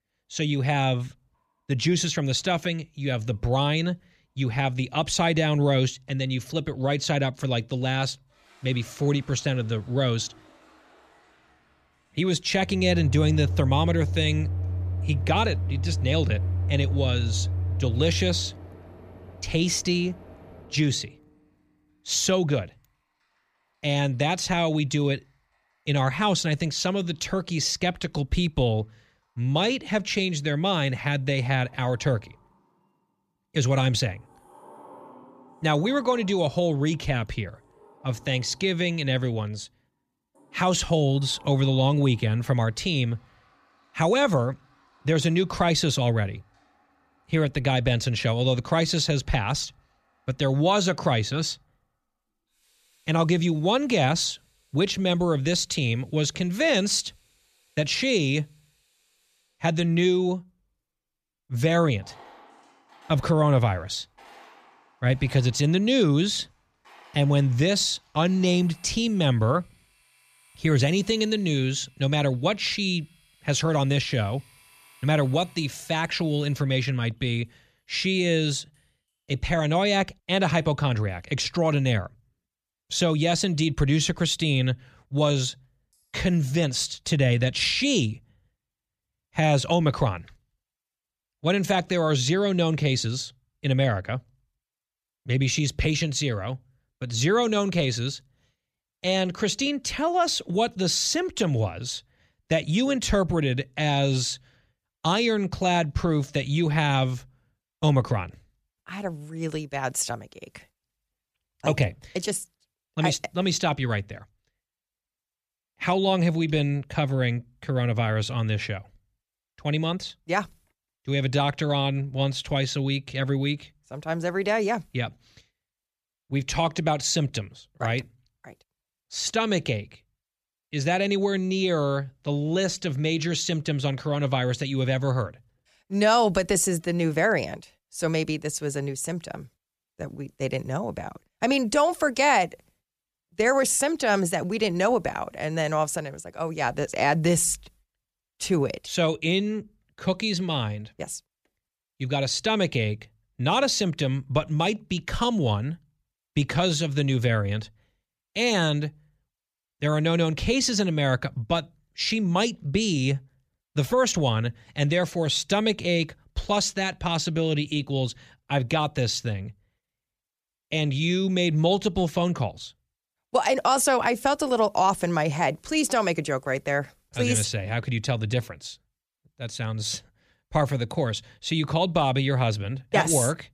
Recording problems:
household noises; loud; until 1:27; 6 dB below the speech

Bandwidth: 14.5 kHz